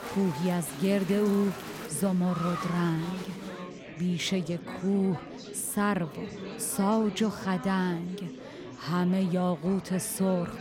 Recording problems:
chatter from many people; noticeable; throughout; 10 dB below the speech

